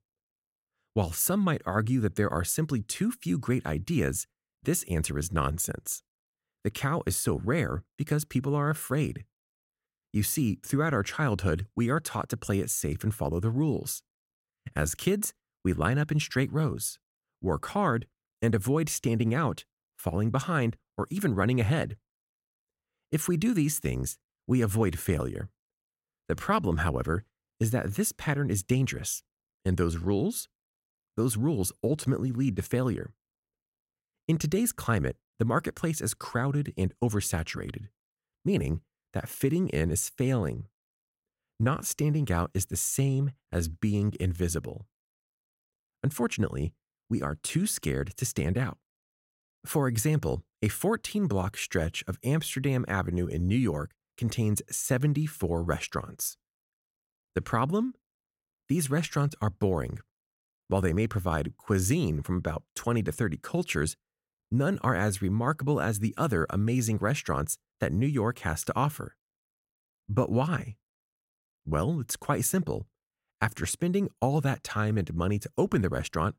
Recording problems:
none

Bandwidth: 16 kHz